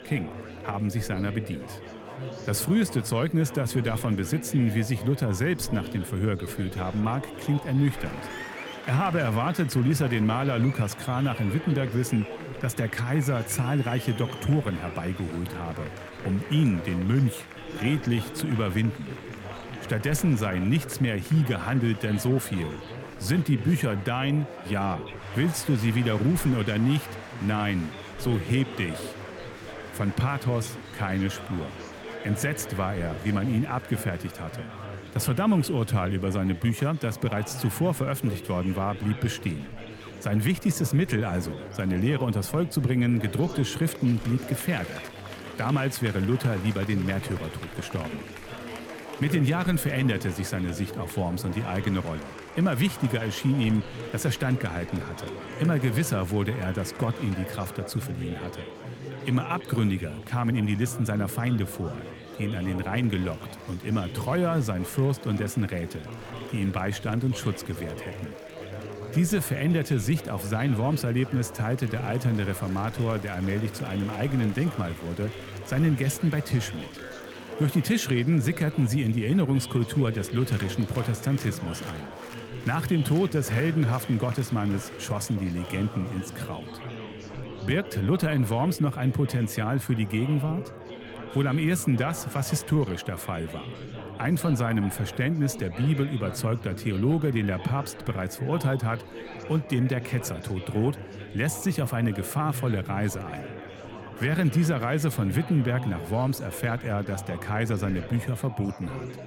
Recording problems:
chatter from many people; noticeable; throughout; 10 dB below the speech

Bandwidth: 18.5 kHz